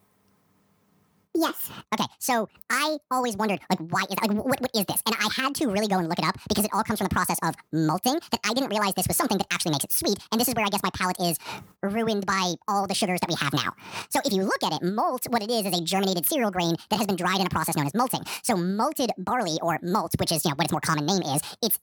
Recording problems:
wrong speed and pitch; too fast and too high; 1.7 times normal speed

